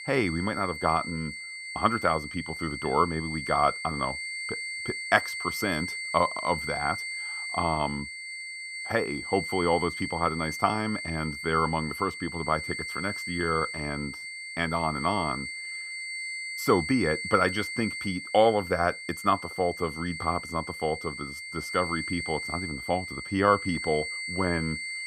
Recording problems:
high-pitched whine; loud; throughout; 2 kHz, 6 dB below the speech

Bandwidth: 15.5 kHz